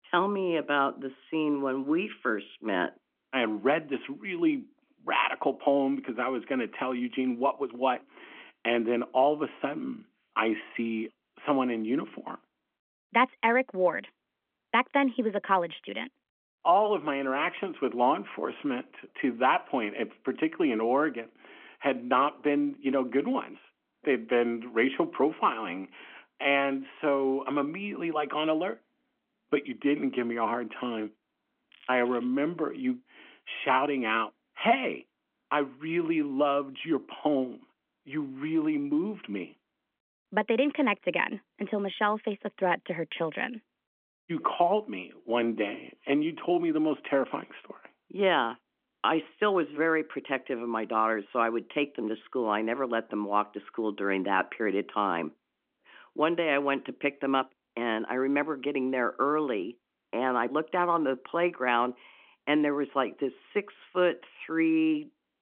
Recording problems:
phone-call audio
crackling; faint; at 32 s; 25 dB below the speech

